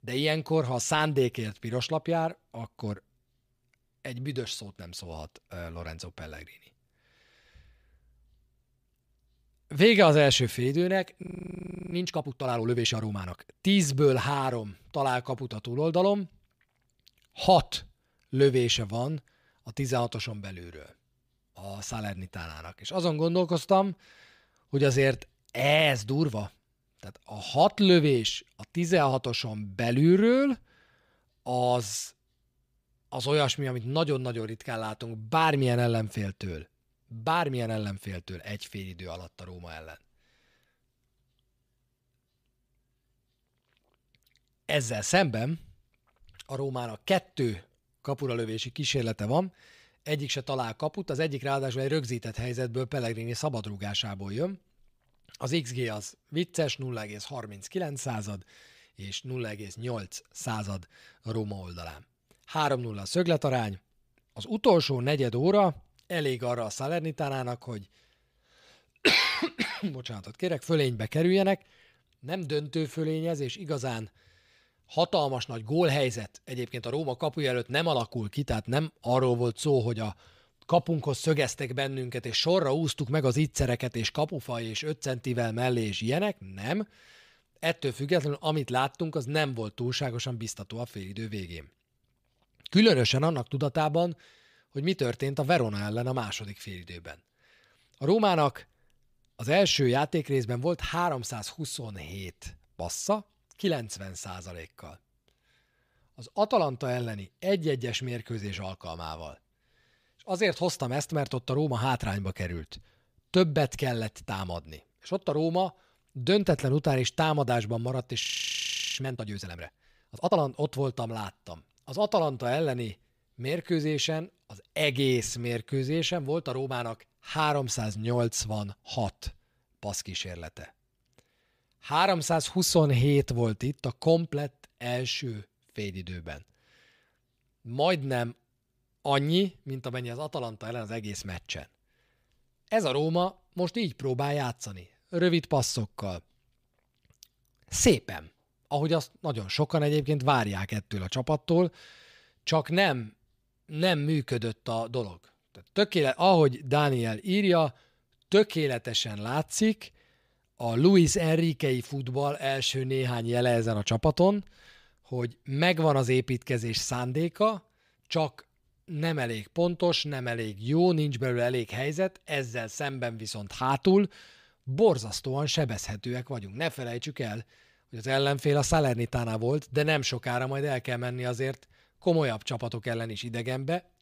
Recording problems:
audio freezing; at 11 s for 0.5 s and at 1:58 for 1 s

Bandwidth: 15 kHz